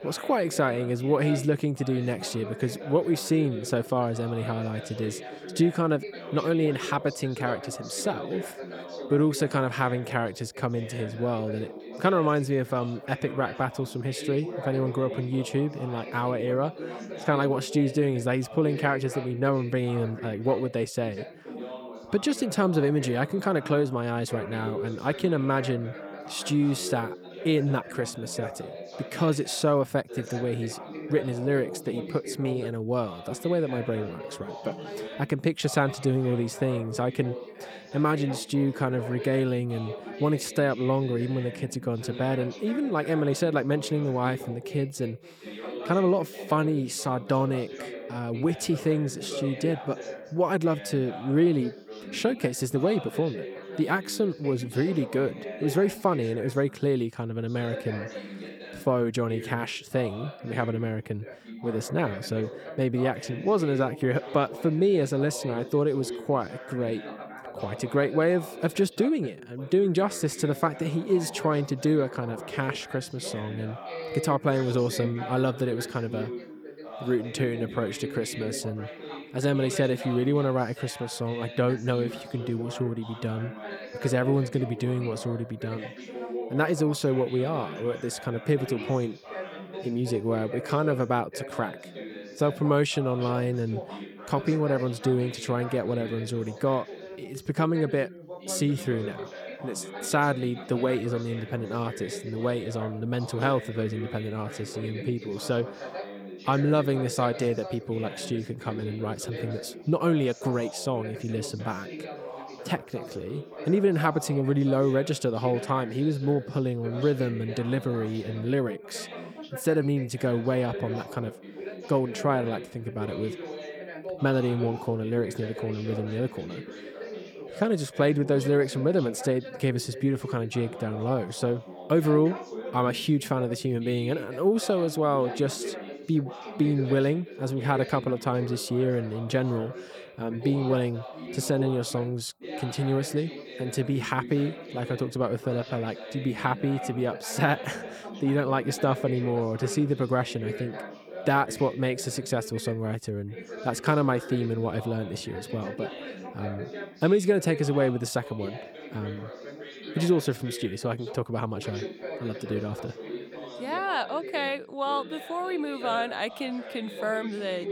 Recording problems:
background chatter; noticeable; throughout; 2 voices, 10 dB below the speech

